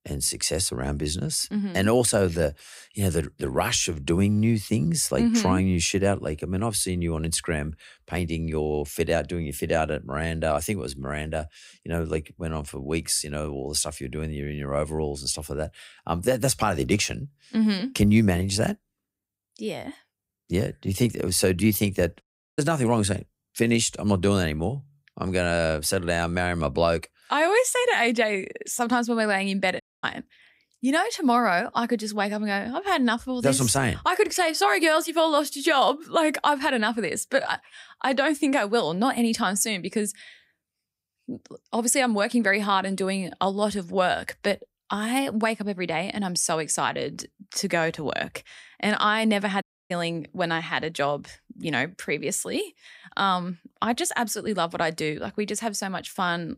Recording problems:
audio cutting out; at 22 s, at 30 s and at 50 s

